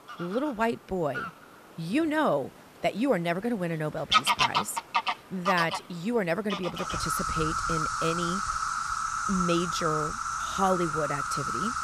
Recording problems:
animal sounds; very loud; throughout; 1 dB above the speech

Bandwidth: 14.5 kHz